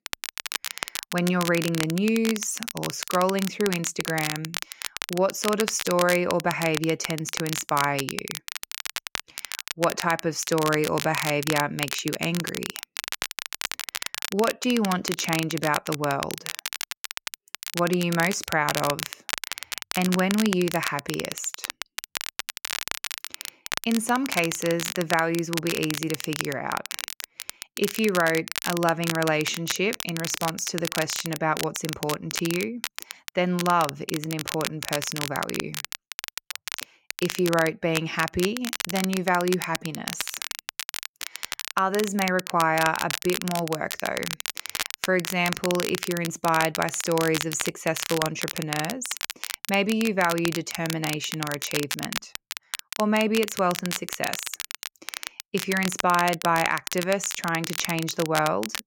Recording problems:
crackle, like an old record; loud; 6 dB below the speech

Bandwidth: 16.5 kHz